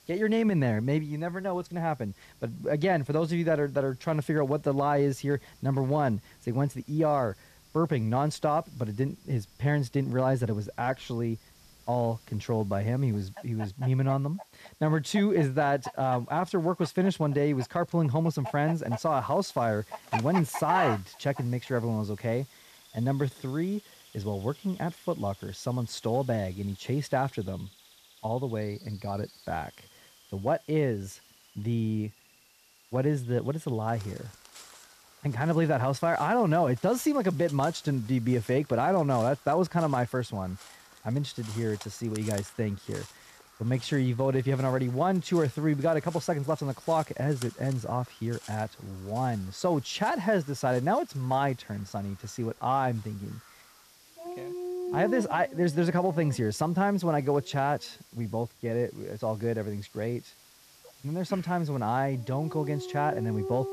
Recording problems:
animal sounds; noticeable; throughout; 15 dB below the speech
hiss; faint; throughout; 25 dB below the speech

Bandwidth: 14.5 kHz